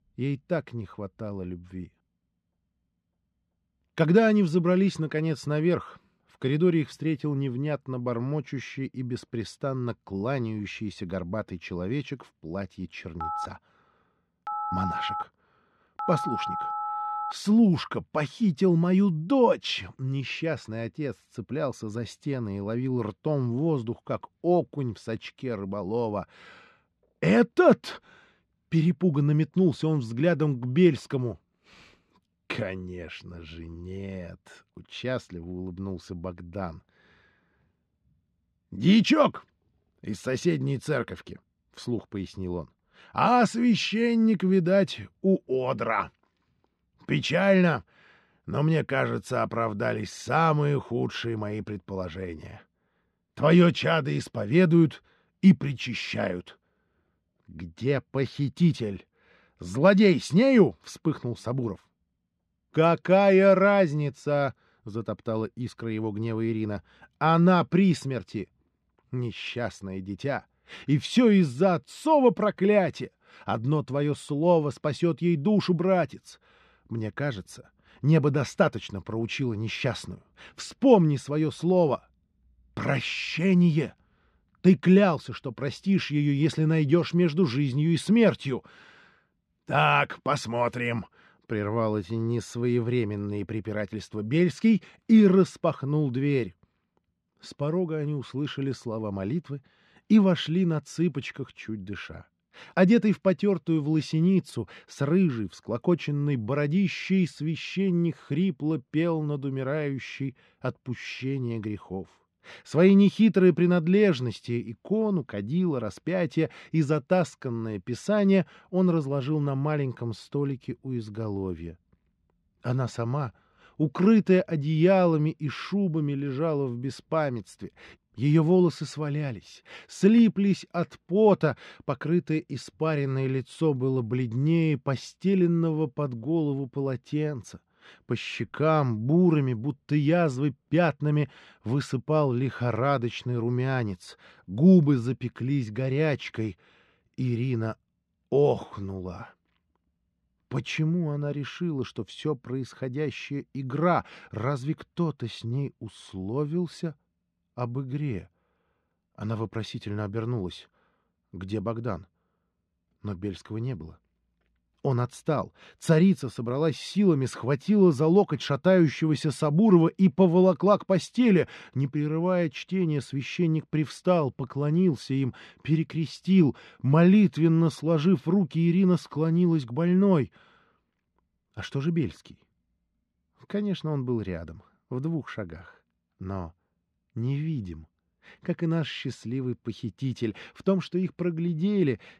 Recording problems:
muffled; slightly; fading above 4 kHz
phone ringing; noticeable; from 13 to 17 s; peak 5 dB below the speech

